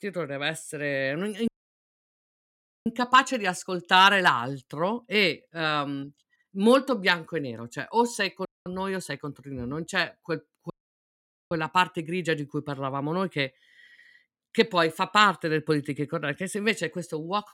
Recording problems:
audio cutting out; at 1.5 s for 1.5 s, at 8.5 s and at 11 s for 1 s

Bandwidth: 16.5 kHz